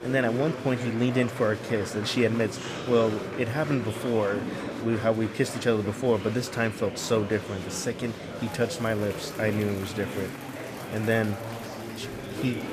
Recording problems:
murmuring crowd; loud; throughout; 8 dB below the speech

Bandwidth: 14.5 kHz